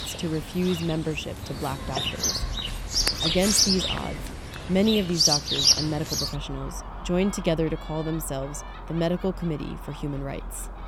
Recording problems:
animal sounds; very loud; throughout; 4 dB above the speech

